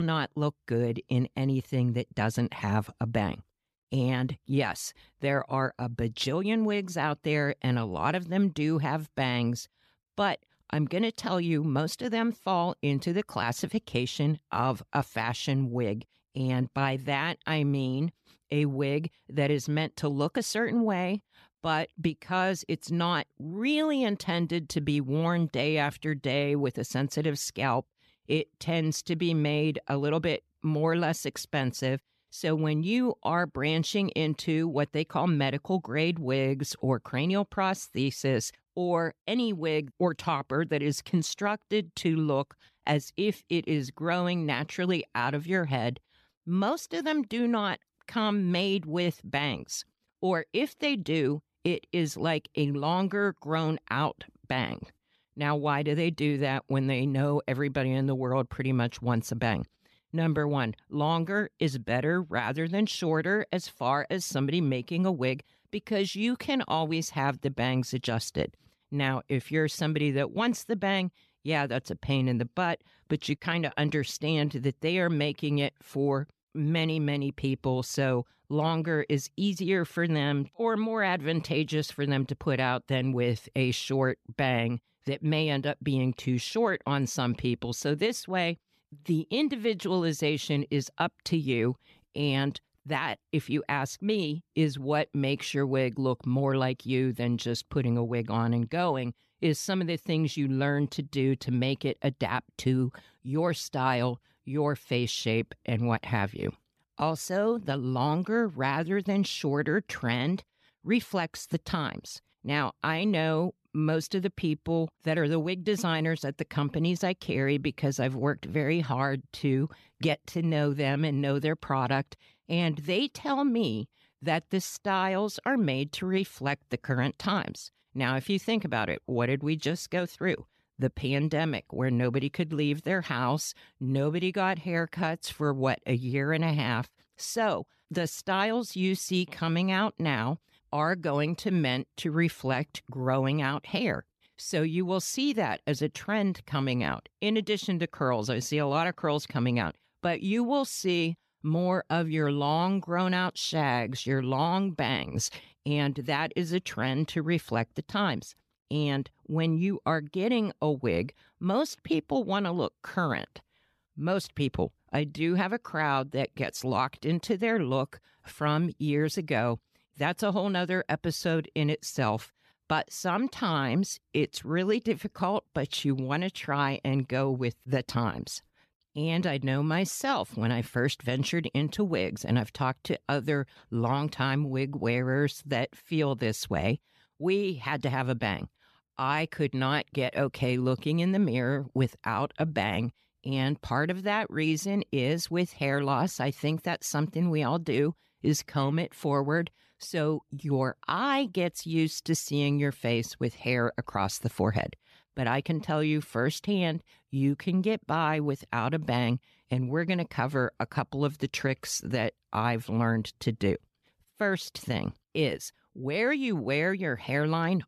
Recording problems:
abrupt cut into speech; at the start

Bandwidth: 14 kHz